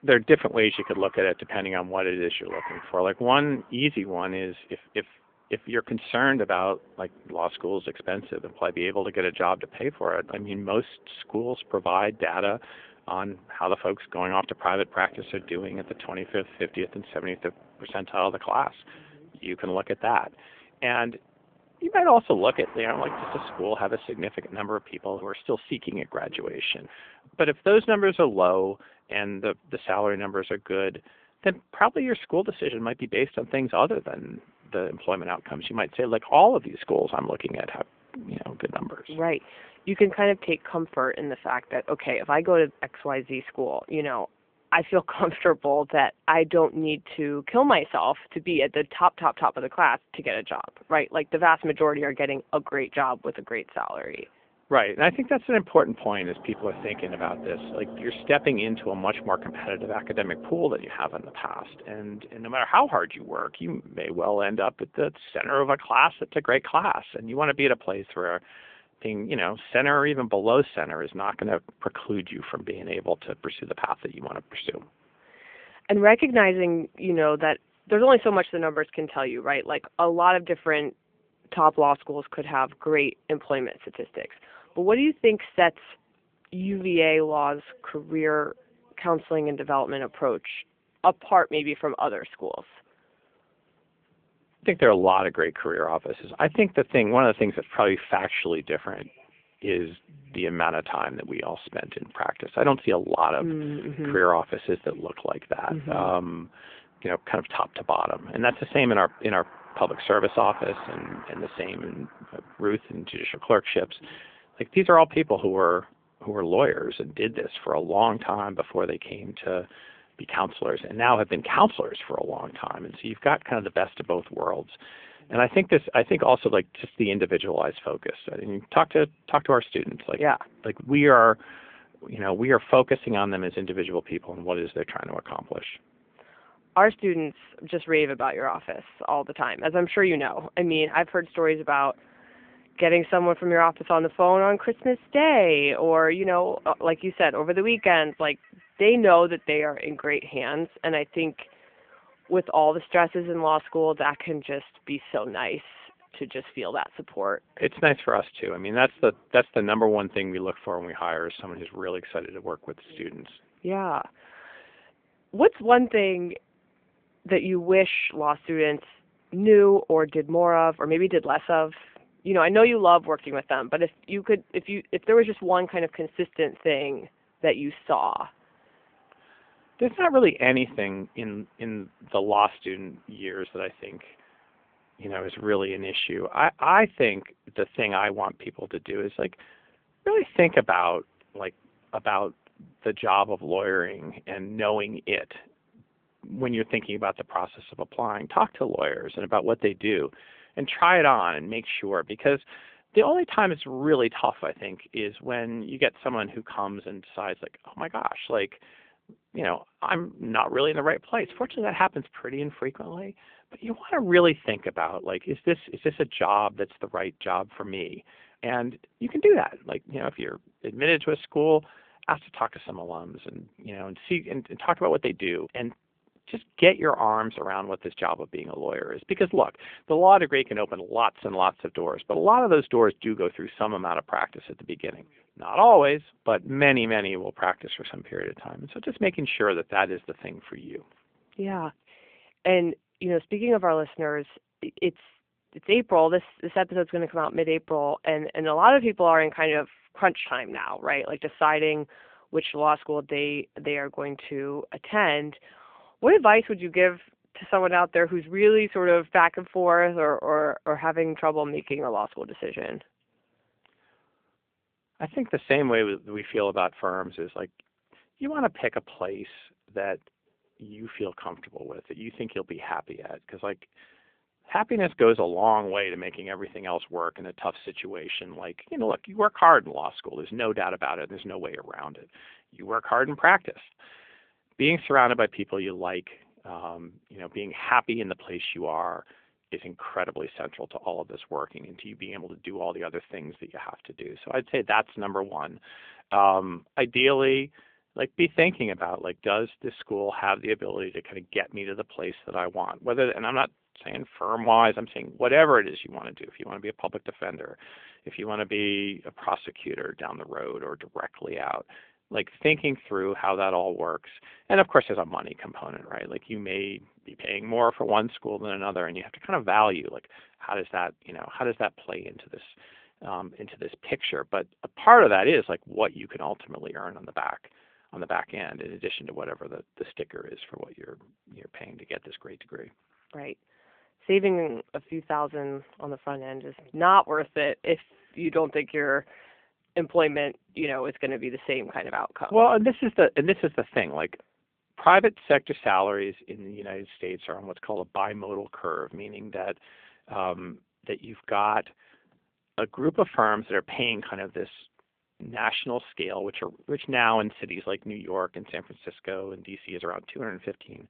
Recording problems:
phone-call audio; nothing above 3.5 kHz
traffic noise; faint; until 3:25; 25 dB below the speech

